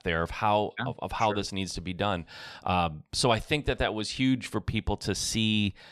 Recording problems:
none

